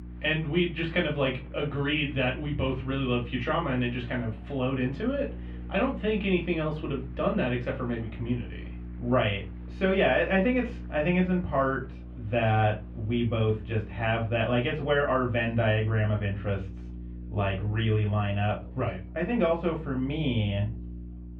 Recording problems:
off-mic speech; far
muffled; very; fading above 3 kHz
room echo; very slight; dies away in 0.2 s
electrical hum; faint; throughout; 60 Hz, 25 dB below the speech
murmuring crowd; faint; throughout; 30 dB below the speech

